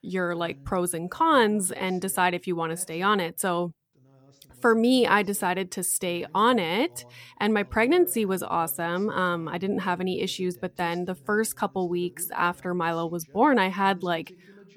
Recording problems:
voice in the background; faint; throughout; 25 dB below the speech

